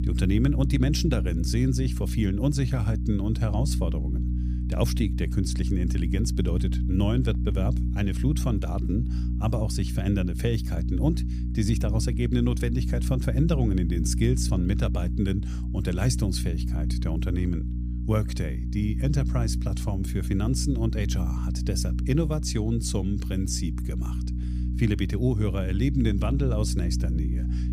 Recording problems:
electrical hum; loud; throughout; 60 Hz, 8 dB below the speech

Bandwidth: 15 kHz